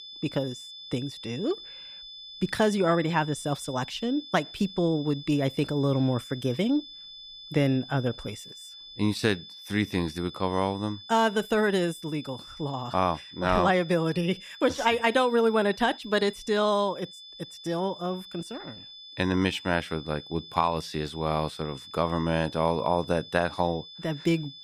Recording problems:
high-pitched whine; noticeable; throughout; 3.5 kHz, 15 dB below the speech

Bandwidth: 15 kHz